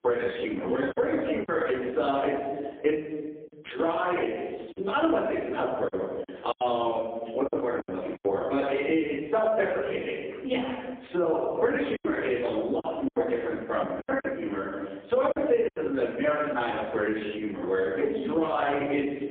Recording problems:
phone-call audio; poor line
off-mic speech; far
room echo; noticeable; dies away in 0.9 s
squashed, flat; somewhat
choppy; very; at 1 s, from 6 to 8 s and from 12 to 16 s; 9% of the speech affected

